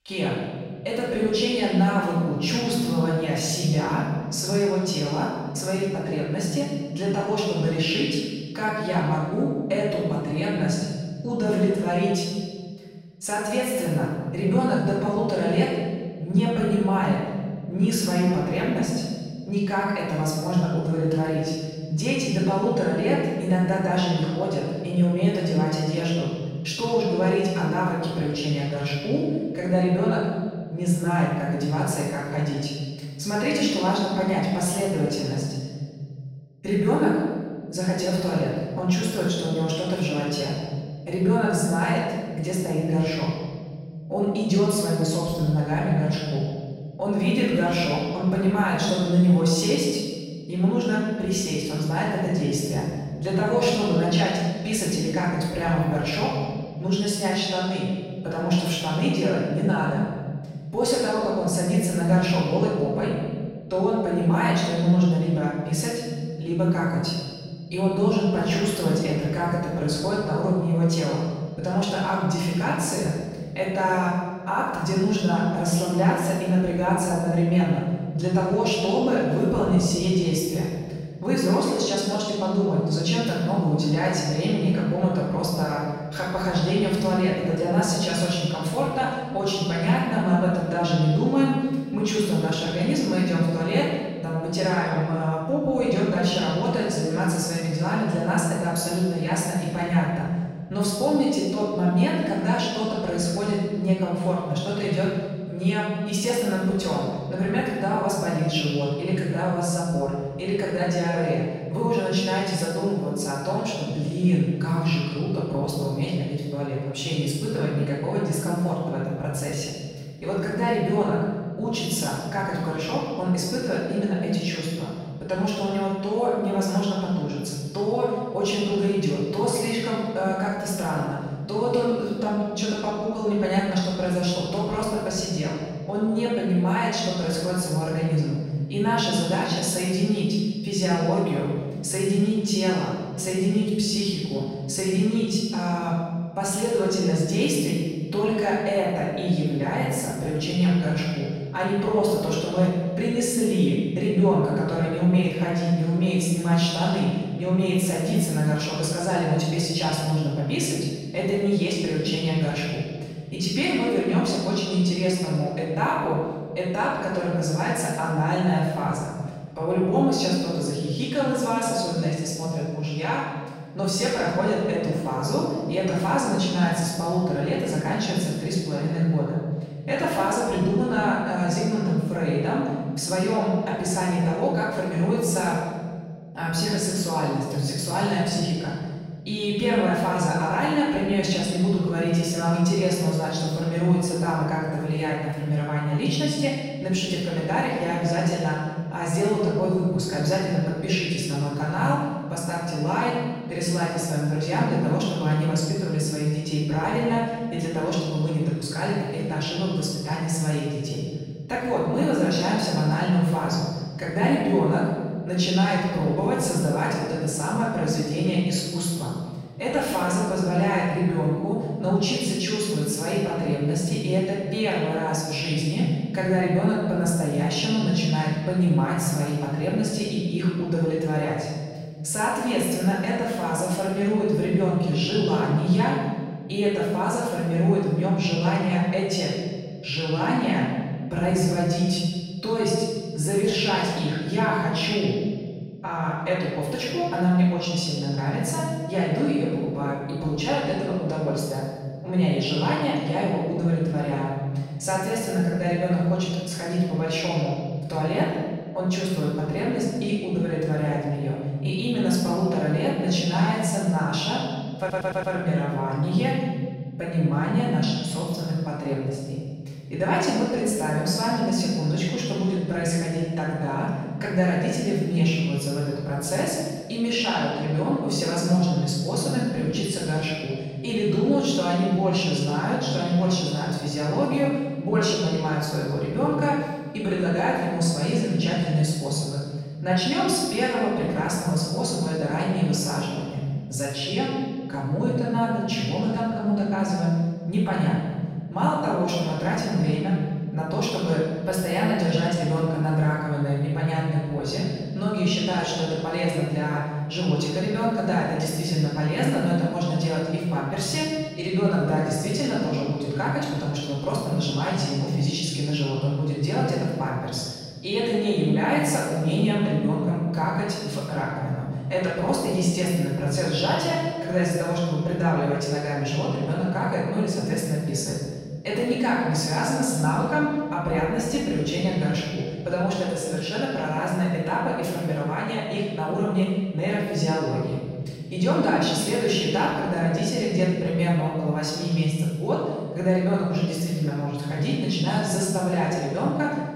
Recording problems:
room echo; strong; dies away in 1.6 s
off-mic speech; far
audio stuttering; at 4:25

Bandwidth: 16 kHz